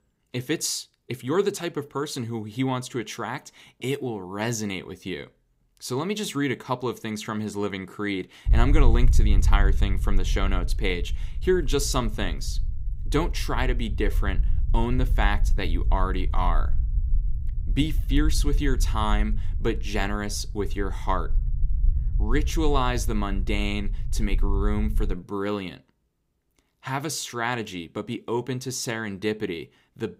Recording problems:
low rumble; noticeable; from 8.5 to 25 s; 20 dB below the speech

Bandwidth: 15.5 kHz